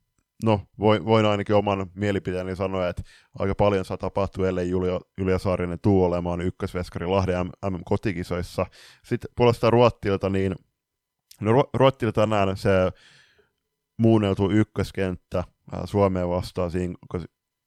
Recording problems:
none

